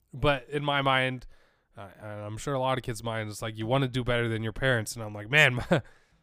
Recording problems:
none

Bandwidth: 15 kHz